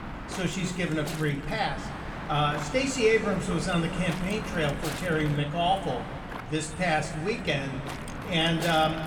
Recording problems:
room echo; slight; dies away in 1.7 s
off-mic speech; somewhat distant
wind noise on the microphone; heavy; 10 dB below the speech

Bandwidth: 18.5 kHz